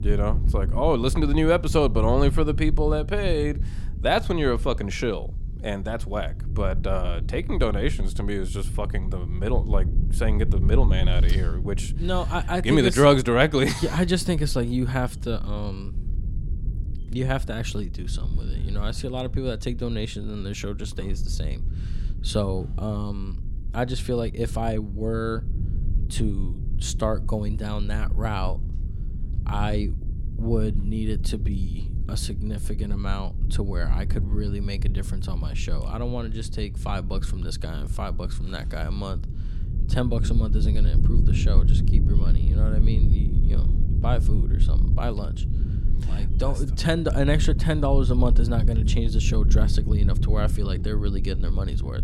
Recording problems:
low rumble; noticeable; throughout; 15 dB below the speech

